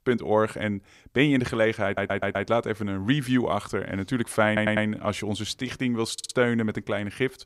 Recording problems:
audio stuttering; at 2 s, at 4.5 s and at 6 s

